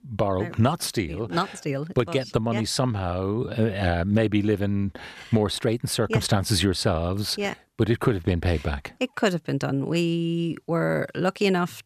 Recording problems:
none

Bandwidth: 14.5 kHz